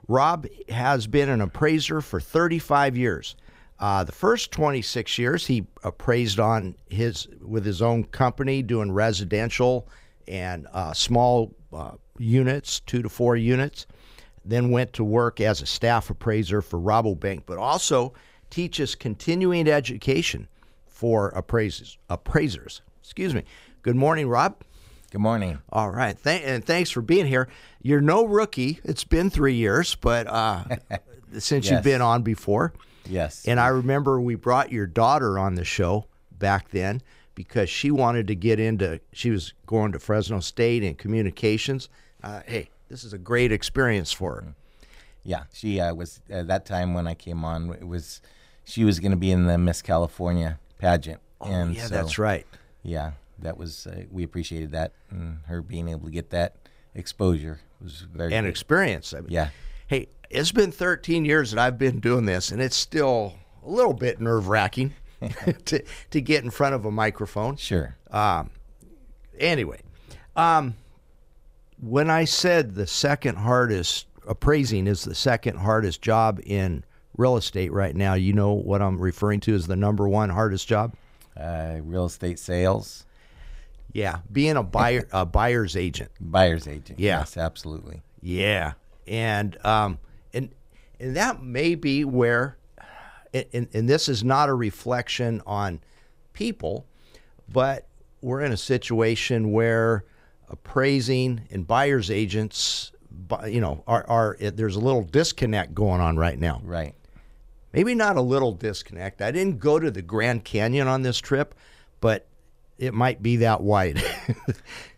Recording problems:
uneven, jittery; strongly; from 4 s to 1:49

